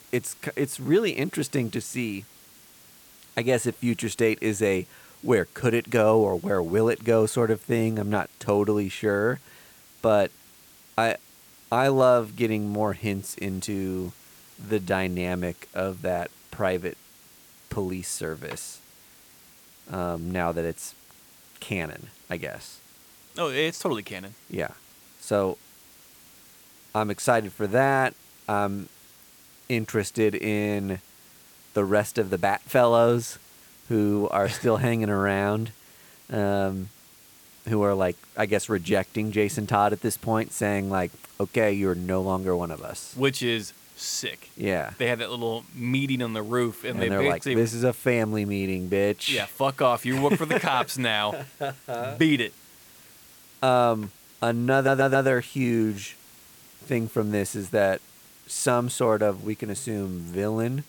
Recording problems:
hiss; faint; throughout; 25 dB below the speech
audio stuttering; at 55 s

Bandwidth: 18.5 kHz